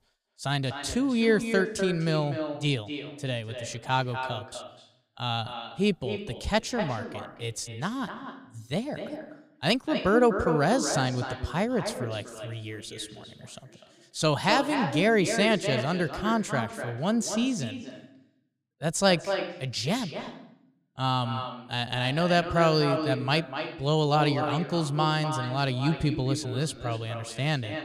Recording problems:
echo of what is said; strong; throughout; 250 ms later, 7 dB below the speech

